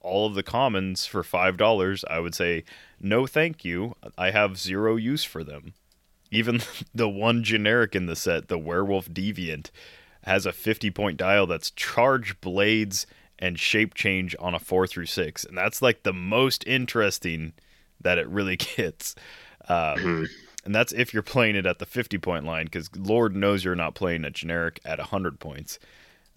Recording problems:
none

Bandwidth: 16.5 kHz